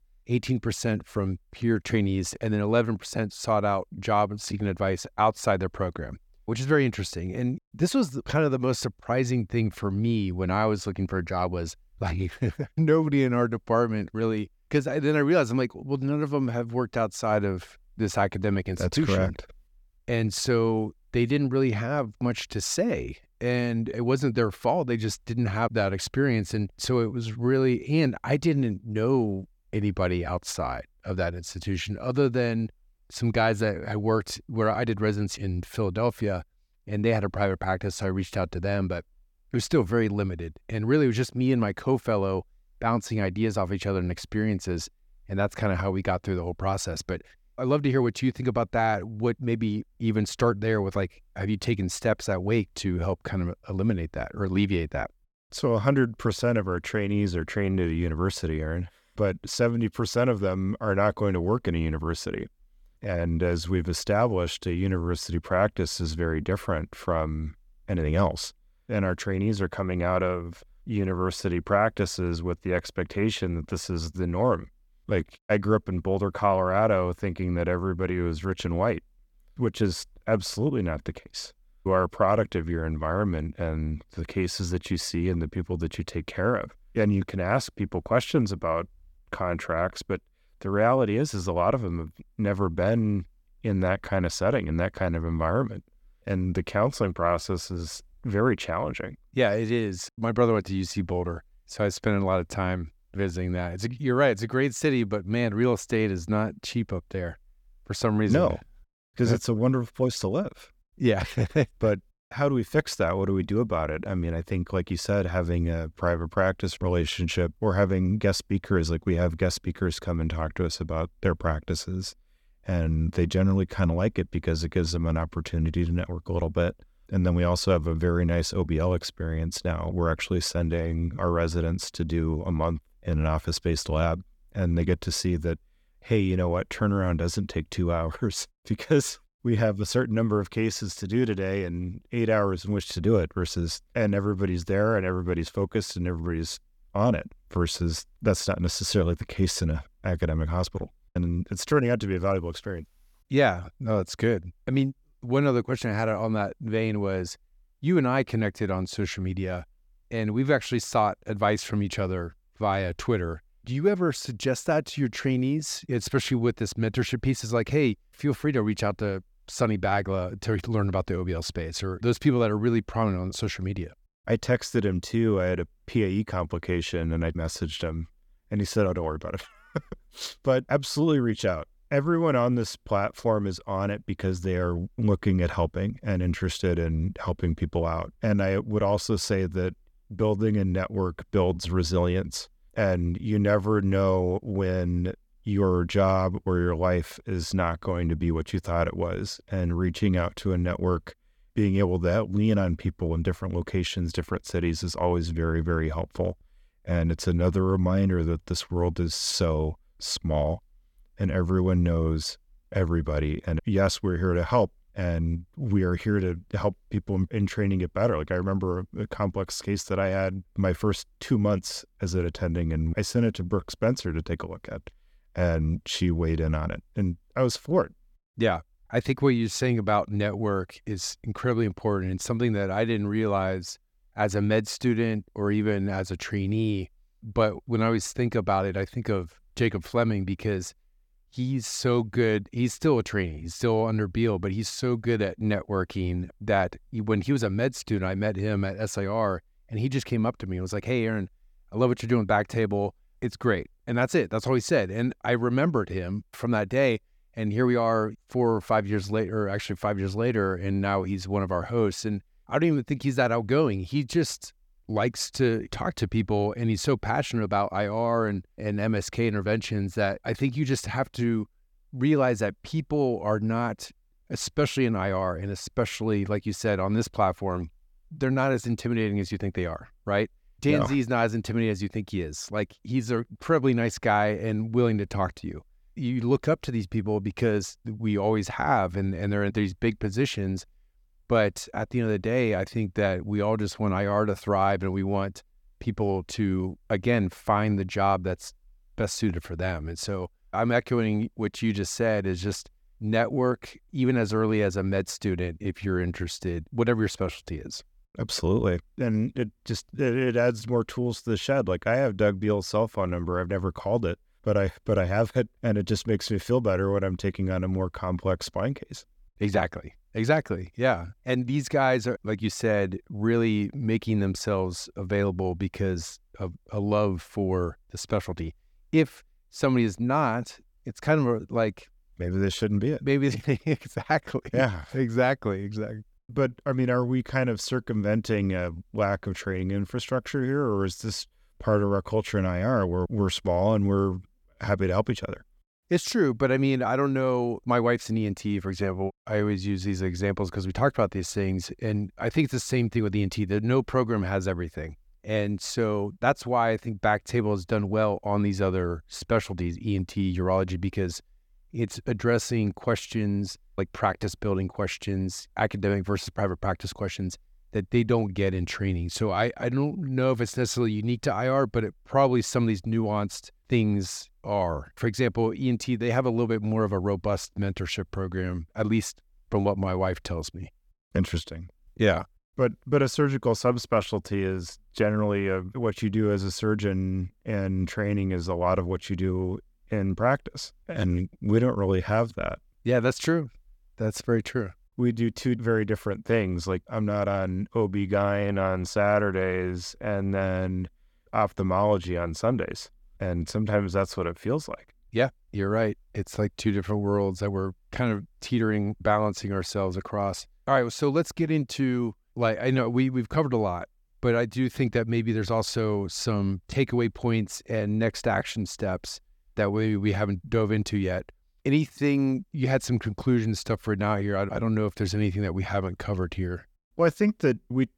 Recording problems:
none

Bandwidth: 18 kHz